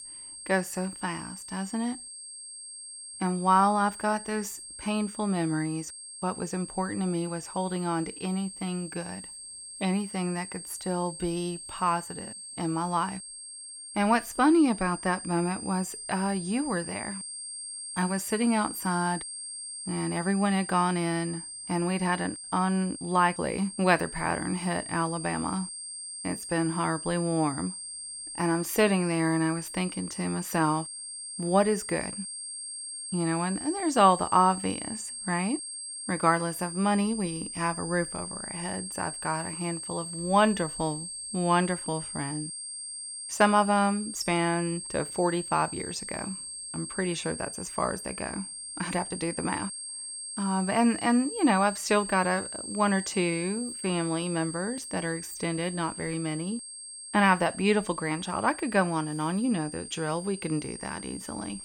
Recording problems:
high-pitched whine; loud; throughout; 8.5 kHz, 8 dB below the speech

